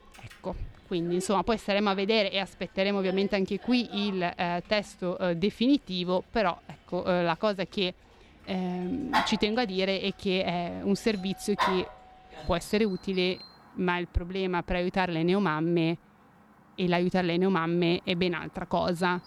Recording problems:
animal sounds; loud; throughout; 10 dB below the speech

